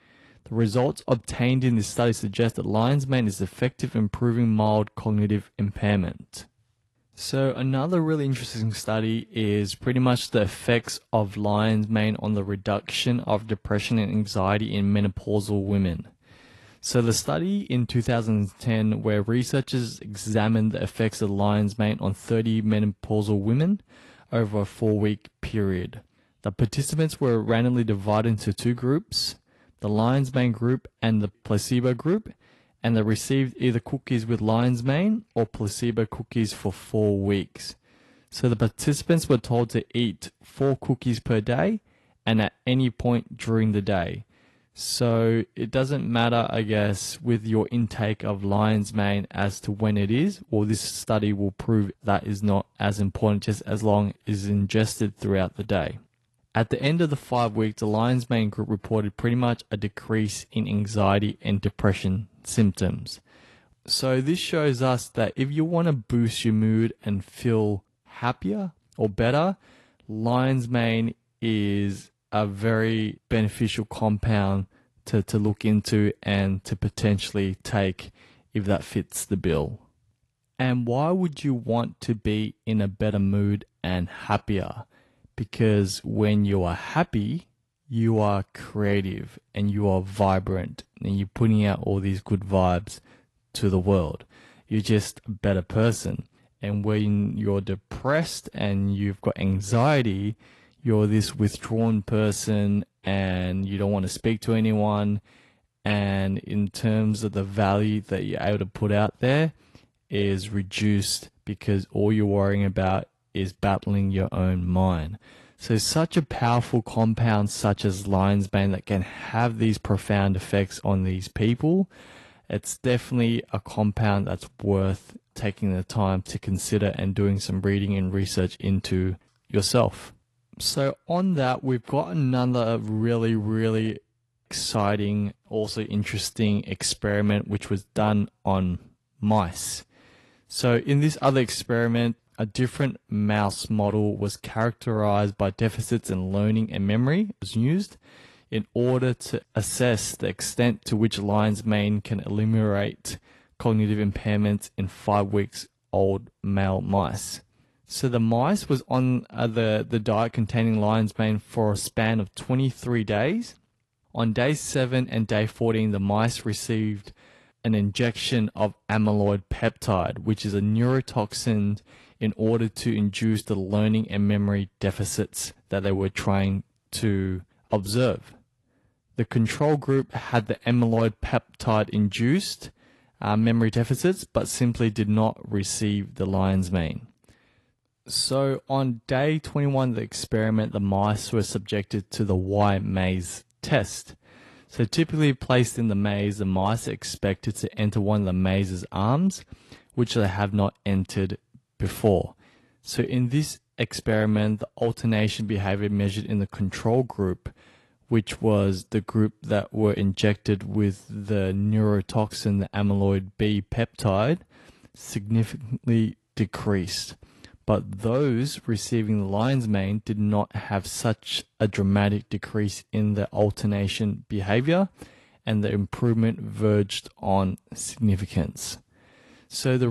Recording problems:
garbled, watery; slightly; nothing above 11.5 kHz
abrupt cut into speech; at the end

